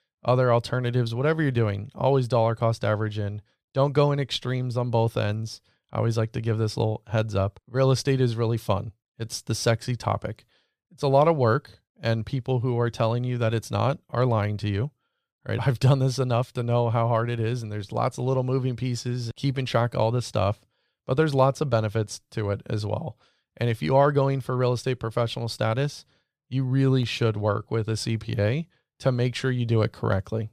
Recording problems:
none

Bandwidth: 15 kHz